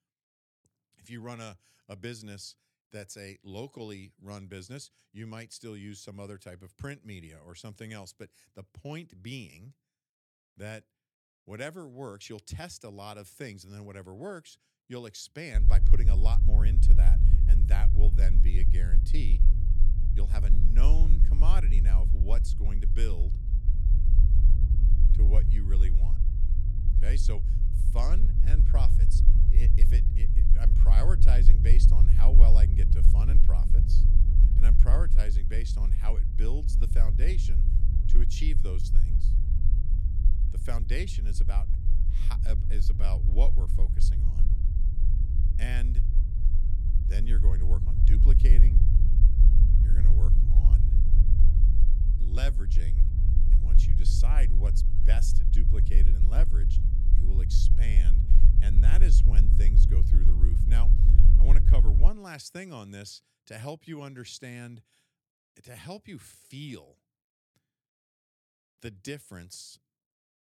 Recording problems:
low rumble; loud; from 16 s to 1:02; 3 dB below the speech

